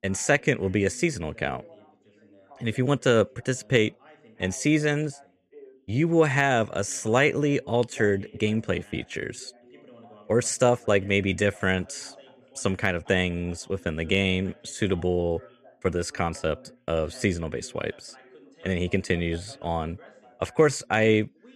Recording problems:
background chatter; faint; throughout; 2 voices, 25 dB below the speech

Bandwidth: 14.5 kHz